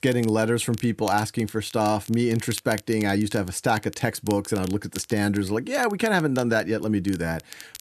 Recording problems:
crackle, like an old record; noticeable; 20 dB below the speech

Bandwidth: 13.5 kHz